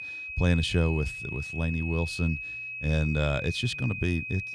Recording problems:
high-pitched whine; loud; throughout; 2.5 kHz, 6 dB below the speech

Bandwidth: 14 kHz